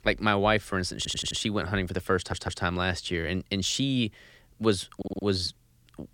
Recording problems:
audio stuttering; at 1 s, at 2 s and at 5 s

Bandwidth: 17 kHz